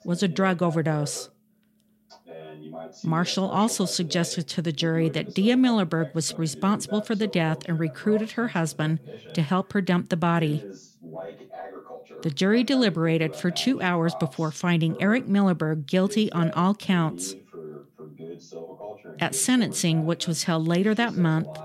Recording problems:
voice in the background; noticeable; throughout; 15 dB below the speech

